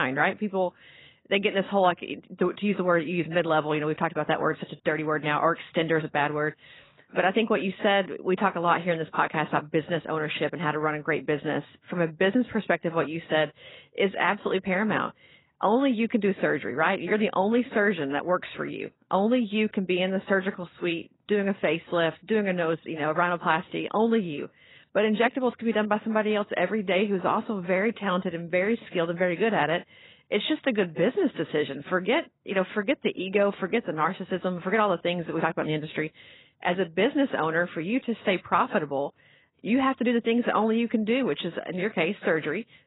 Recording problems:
garbled, watery; badly; nothing above 4 kHz
abrupt cut into speech; at the start

